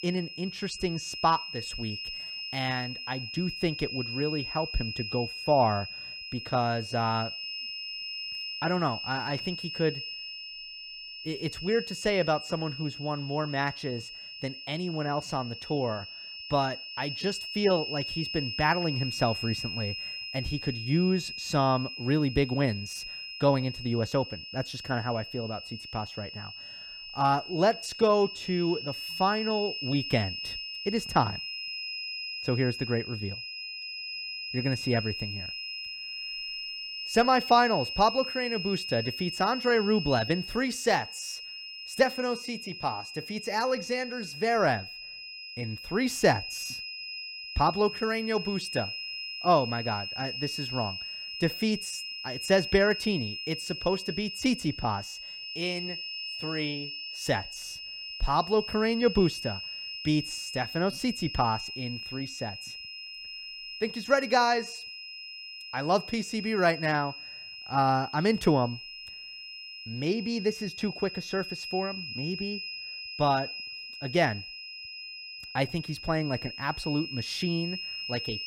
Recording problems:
high-pitched whine; loud; throughout; 5 kHz, 7 dB below the speech

